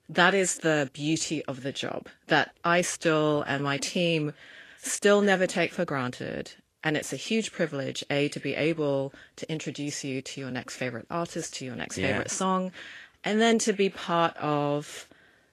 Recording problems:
garbled, watery; slightly; nothing above 12.5 kHz

